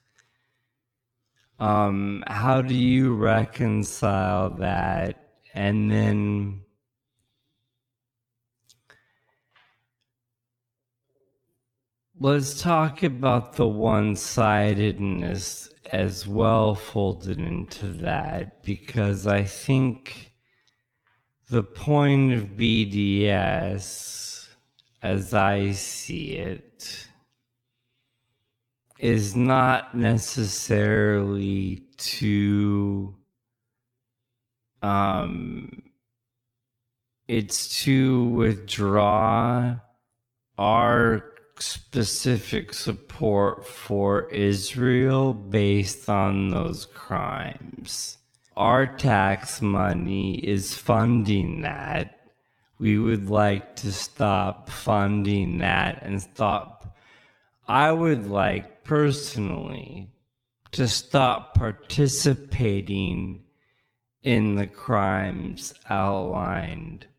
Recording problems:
wrong speed, natural pitch; too slow; 0.5 times normal speed

